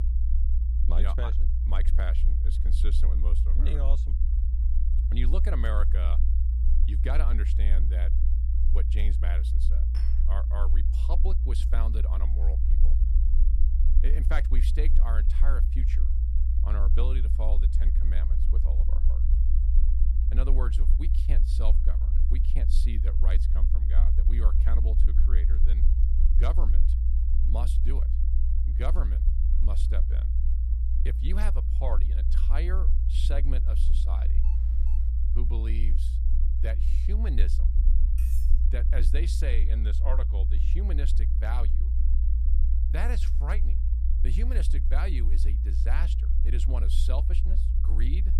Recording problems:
low rumble; loud; throughout; 5 dB below the speech
clattering dishes; faint; at 10 s; peak 10 dB below the speech
alarm; faint; at 34 s; peak 20 dB below the speech
clattering dishes; noticeable; at 38 s; peak 8 dB below the speech

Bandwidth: 14.5 kHz